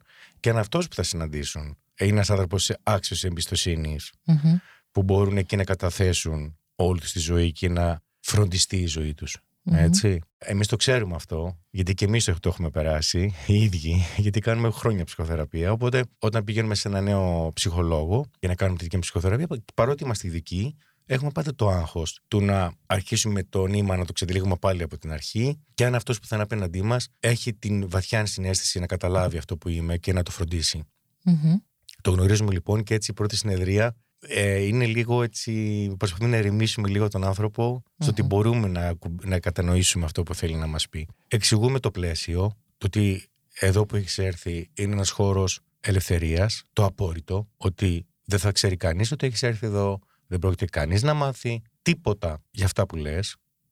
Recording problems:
none

